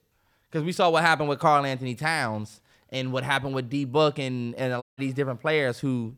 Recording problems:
audio cutting out; at 5 s

